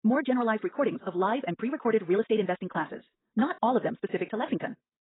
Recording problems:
garbled, watery; badly; nothing above 3.5 kHz
wrong speed, natural pitch; too fast; 1.7 times normal speed

